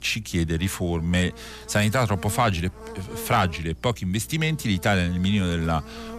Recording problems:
electrical hum; noticeable; throughout; 60 Hz, 20 dB below the speech

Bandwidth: 14.5 kHz